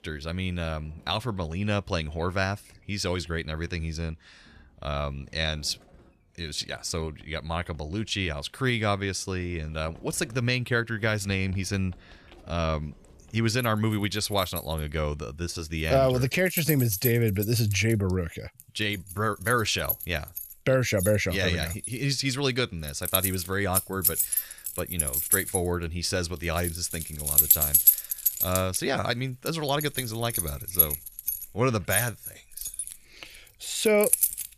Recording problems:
household noises; very loud; throughout; 2 dB above the speech

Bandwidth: 14.5 kHz